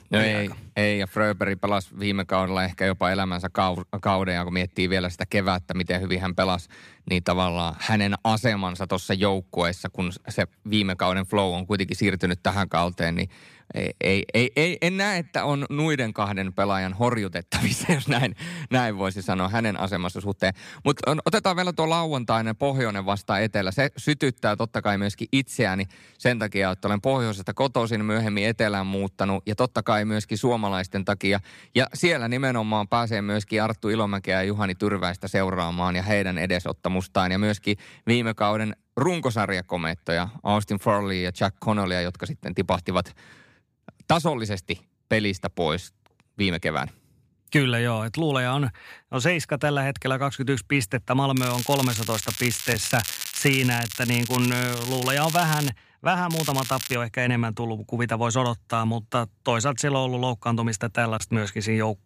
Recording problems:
crackling; loud; from 51 to 56 s and at 56 s; 6 dB below the speech

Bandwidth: 15 kHz